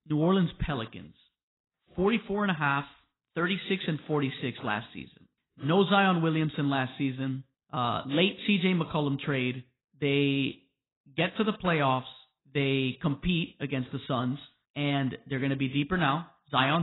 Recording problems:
garbled, watery; badly; nothing above 4 kHz
abrupt cut into speech; at the end

